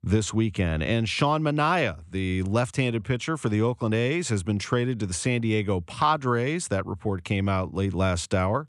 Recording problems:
none

